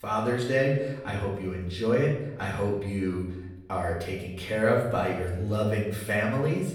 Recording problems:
off-mic speech; far
room echo; noticeable; dies away in 0.7 s

